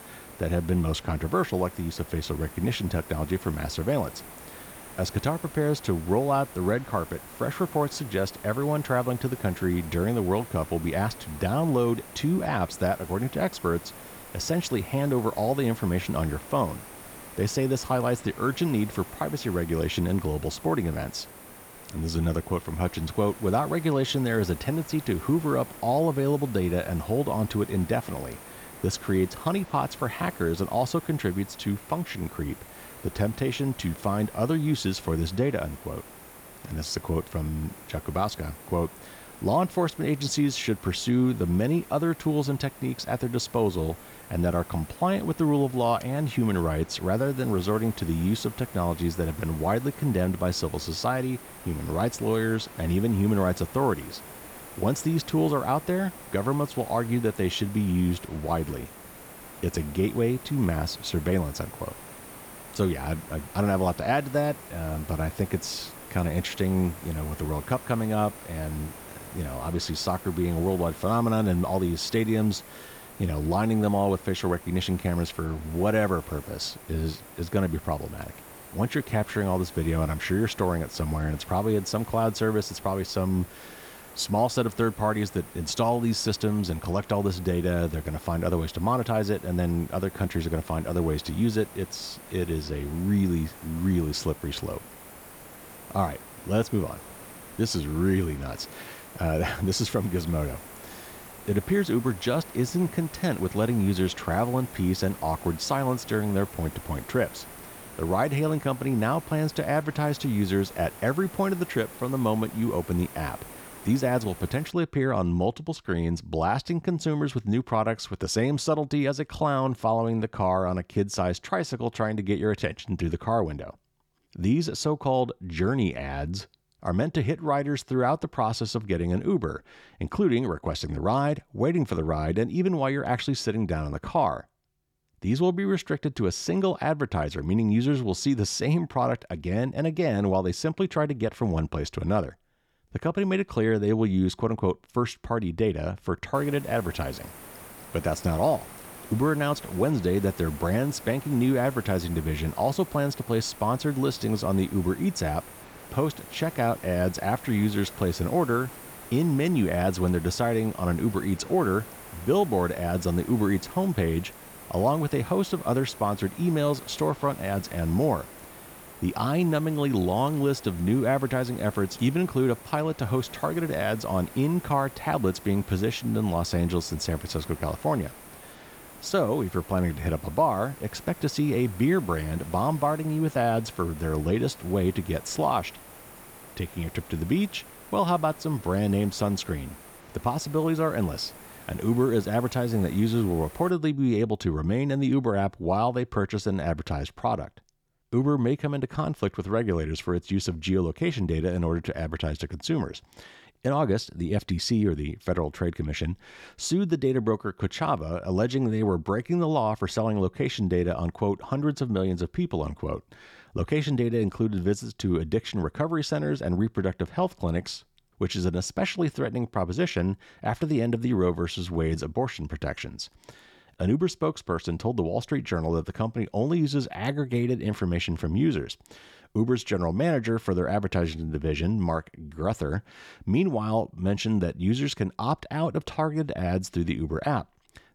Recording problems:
hiss; noticeable; until 1:55 and from 2:26 to 3:14; 15 dB below the speech

